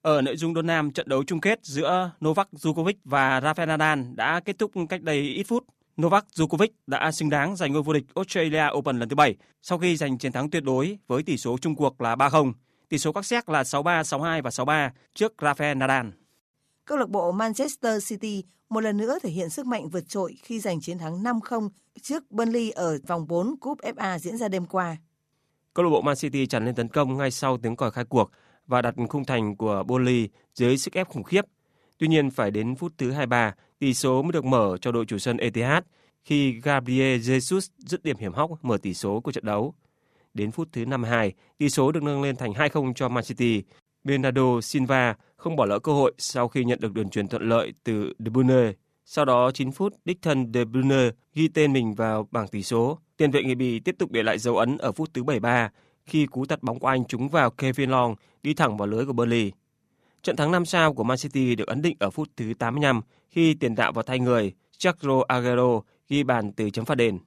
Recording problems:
none

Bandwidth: 14.5 kHz